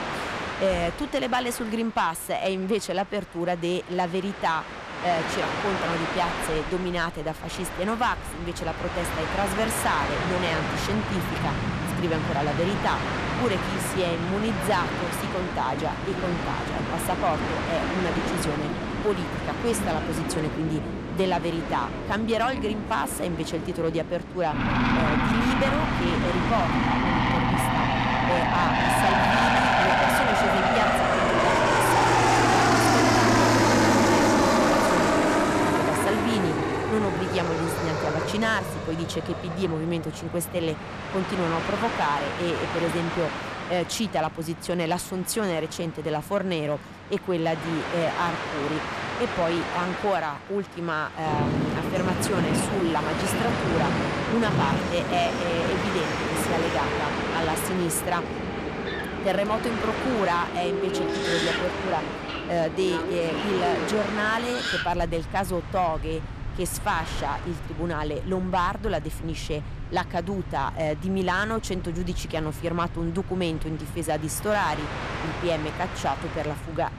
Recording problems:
distortion; slight; 10 dB below the speech
train or aircraft noise; very loud; throughout; 2 dB above the speech

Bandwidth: 14 kHz